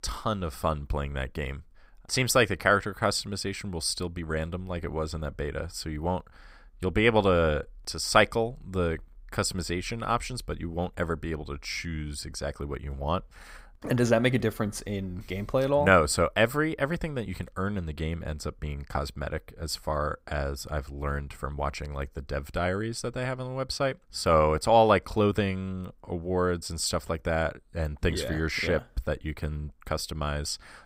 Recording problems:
none

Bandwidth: 15.5 kHz